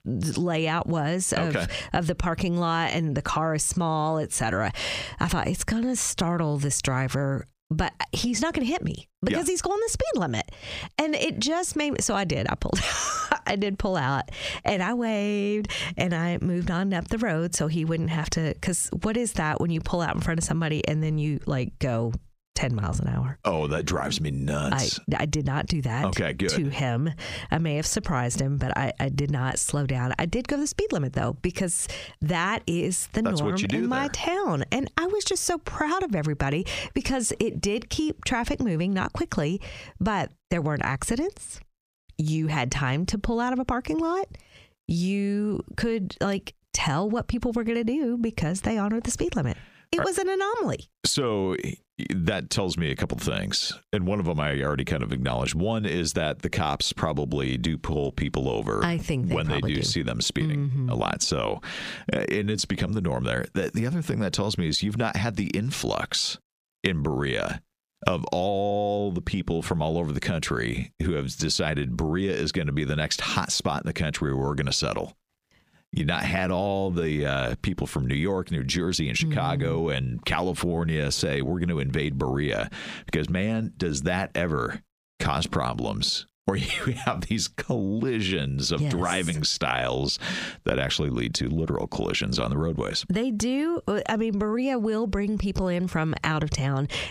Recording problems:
squashed, flat; heavily

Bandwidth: 15 kHz